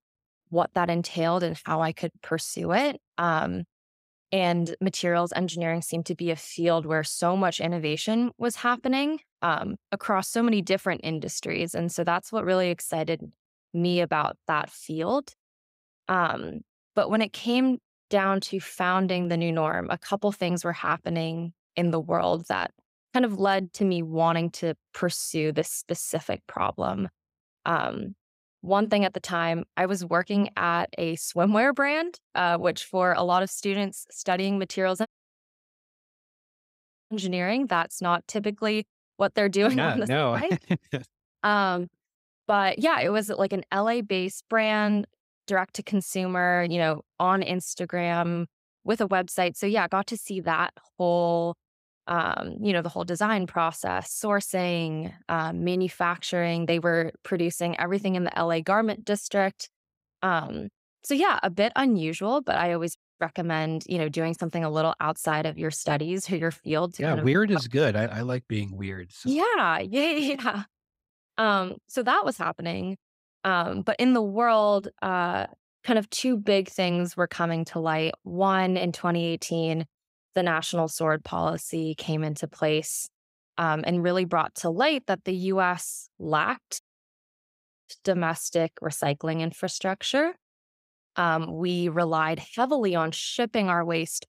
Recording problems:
audio cutting out; at 35 s for 2 s, at 1:03 and at 1:27 for 1 s

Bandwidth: 15.5 kHz